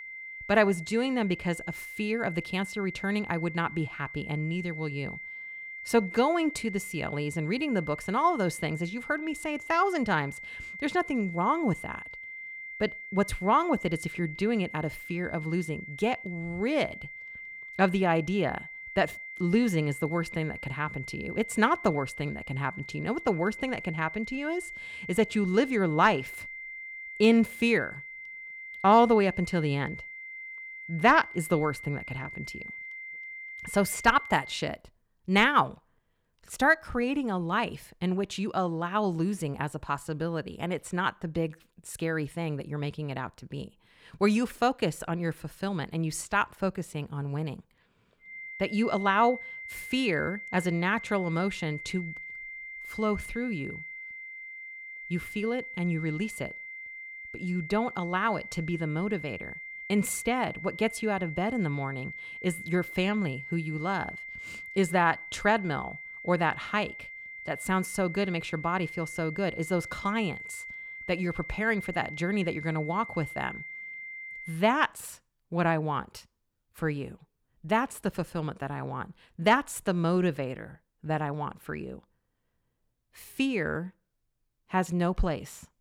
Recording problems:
high-pitched whine; noticeable; until 35 s and from 48 s to 1:15; 2 kHz, 10 dB below the speech

